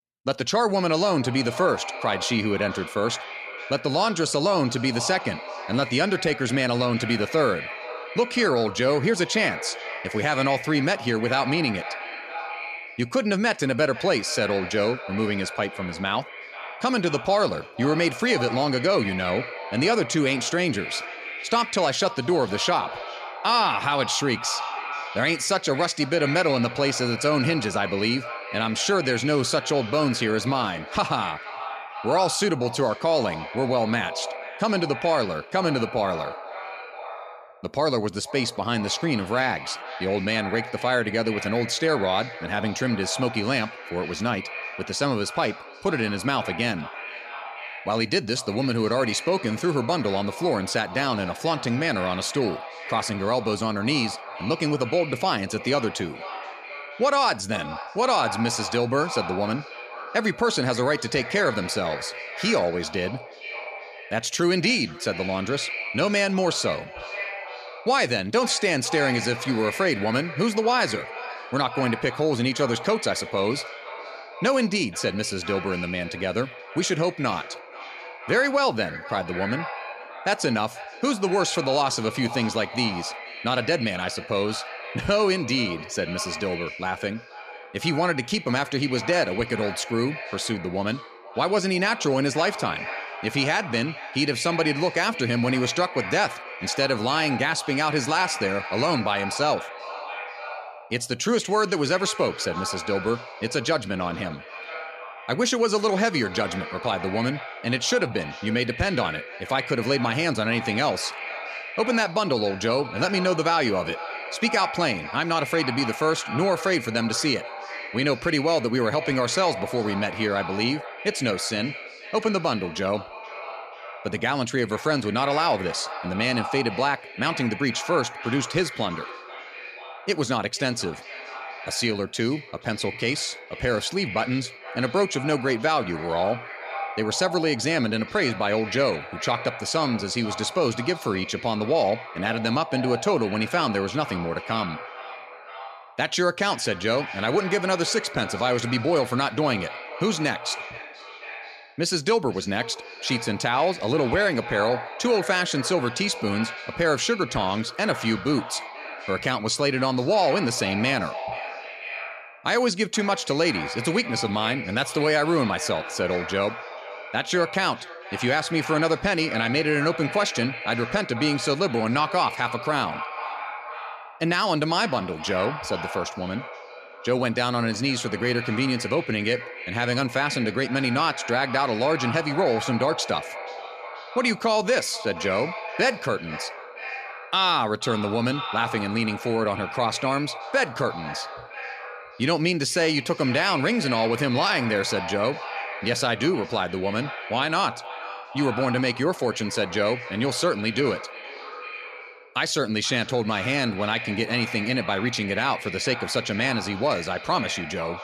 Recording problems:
echo of what is said; strong; throughout; 480 ms later, 10 dB below the speech

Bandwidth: 14.5 kHz